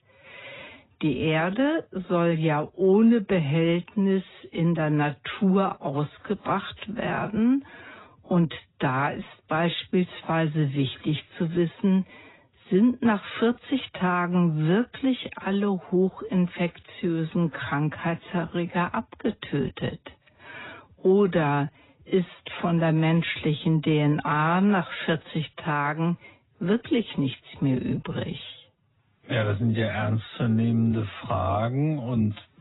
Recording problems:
garbled, watery; badly; nothing above 4 kHz
wrong speed, natural pitch; too slow; 0.6 times normal speed

